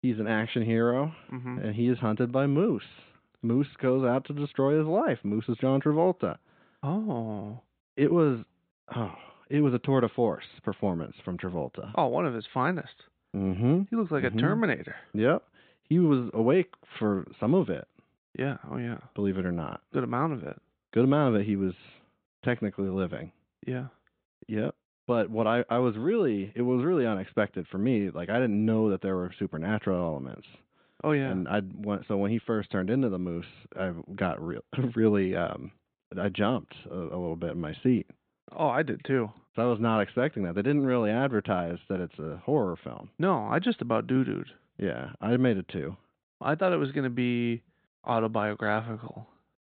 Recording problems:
high frequencies cut off; severe; nothing above 4 kHz

